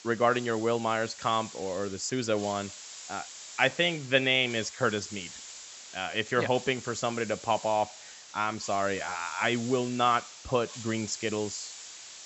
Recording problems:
high frequencies cut off; noticeable; nothing above 8 kHz
hiss; noticeable; throughout; 15 dB below the speech

